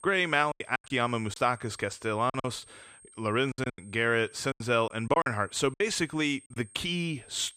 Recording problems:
high-pitched whine; faint; throughout; 8.5 kHz, 25 dB below the speech
choppy; very; from 0.5 to 4 s and from 4.5 to 6.5 s; 14% of the speech affected

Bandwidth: 15 kHz